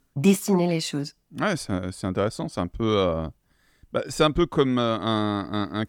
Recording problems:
none

